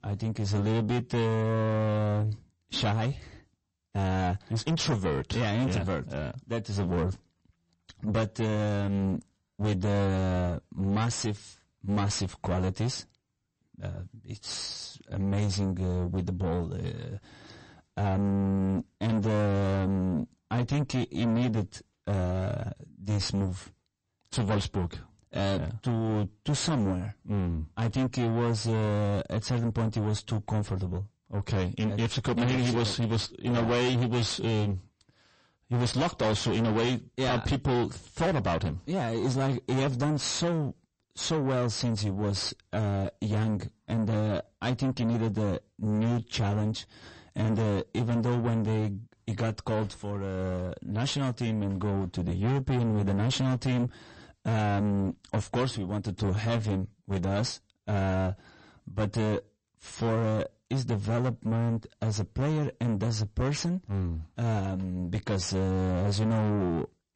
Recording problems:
distortion; heavy; 5 dB below the speech
garbled, watery; slightly; nothing above 8 kHz

